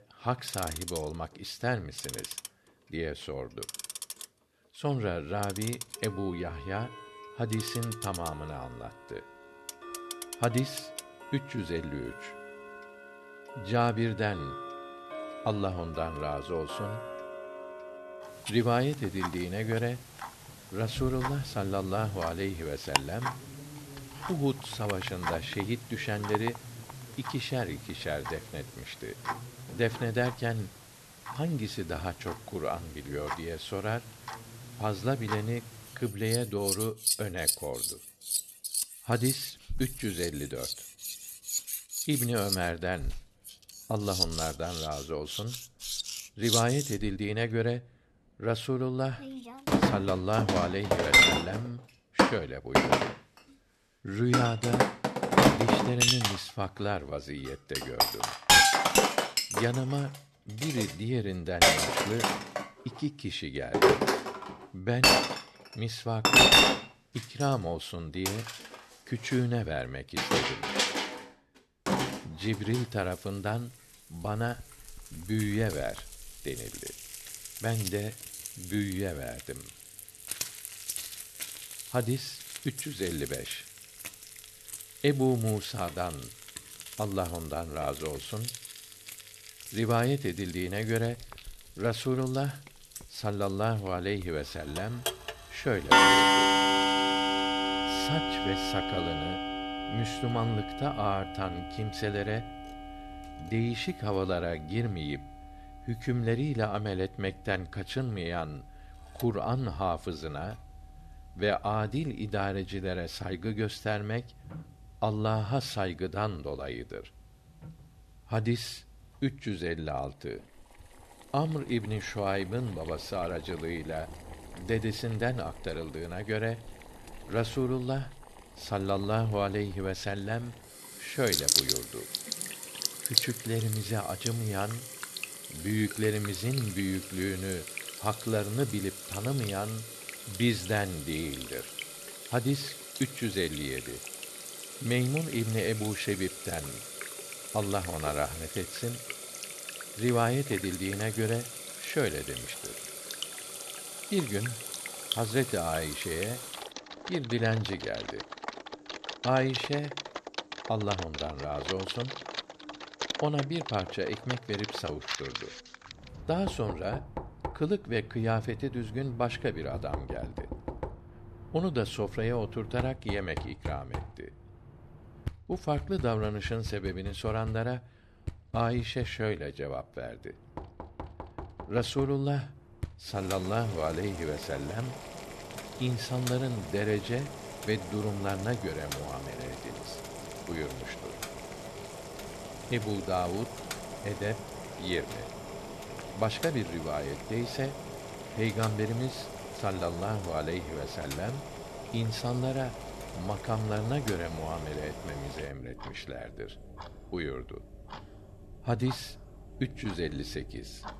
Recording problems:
household noises; very loud; throughout; 1 dB above the speech

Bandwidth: 13.5 kHz